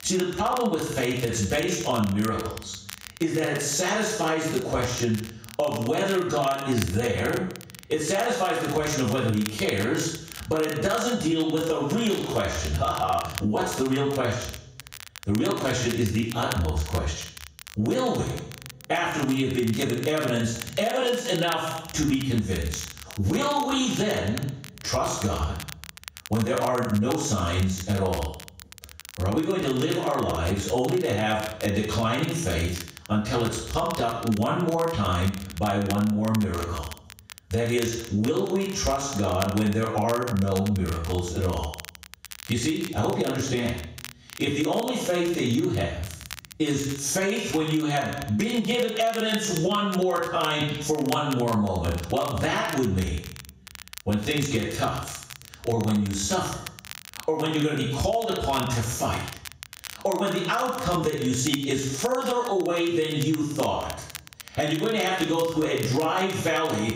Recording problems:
off-mic speech; far
squashed, flat; heavily
room echo; noticeable; dies away in 0.6 s
crackle, like an old record; noticeable; 15 dB below the speech

